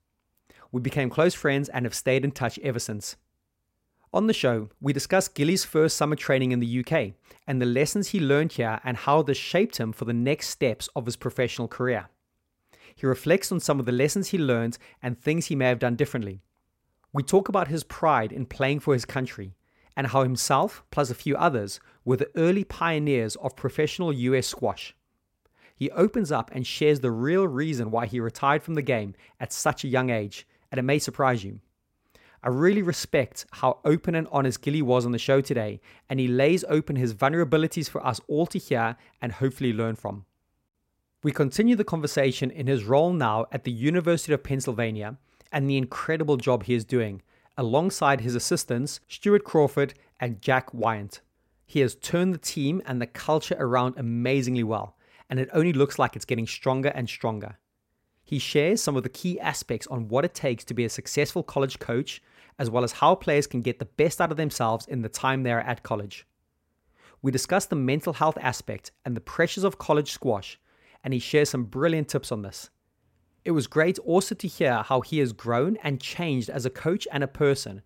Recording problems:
none

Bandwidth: 16 kHz